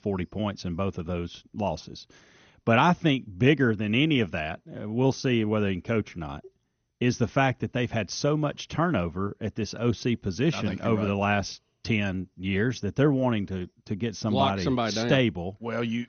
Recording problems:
garbled, watery; slightly; nothing above 6.5 kHz

